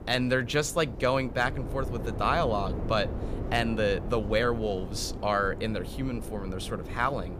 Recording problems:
wind noise on the microphone; occasional gusts; 15 dB below the speech

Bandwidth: 15 kHz